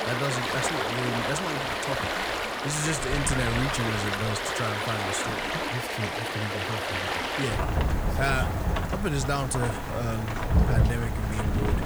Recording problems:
rain or running water; very loud; throughout; 3 dB above the speech

